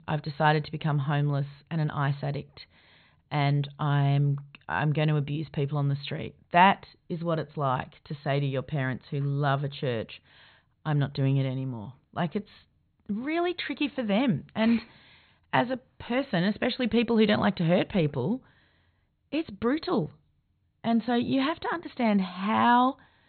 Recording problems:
high frequencies cut off; severe; nothing above 4.5 kHz

